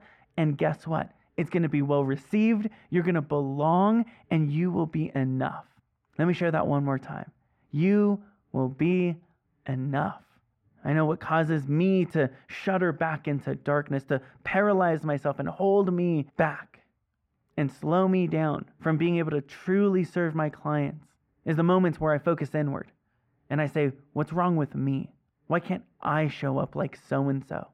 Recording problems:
muffled; very; fading above 3 kHz

